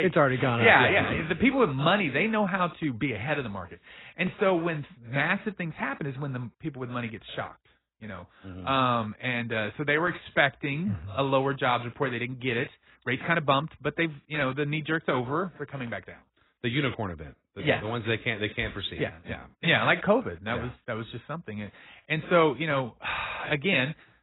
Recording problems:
garbled, watery; badly; nothing above 4 kHz
abrupt cut into speech; at the start

